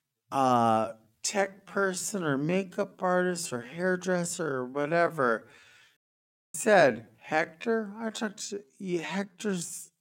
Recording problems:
wrong speed, natural pitch; too slow; 0.5 times normal speed
audio cutting out; at 6 s for 0.5 s

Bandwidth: 16.5 kHz